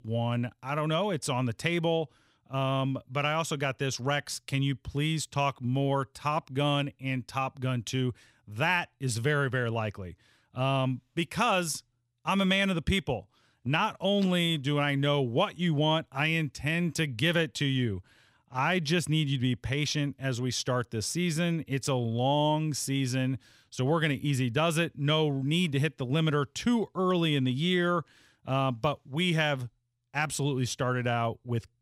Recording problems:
none

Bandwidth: 15.5 kHz